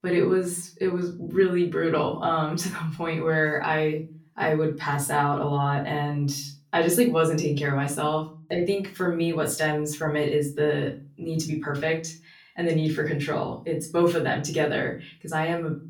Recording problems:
off-mic speech; far
room echo; very slight; dies away in 0.3 s

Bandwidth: 18 kHz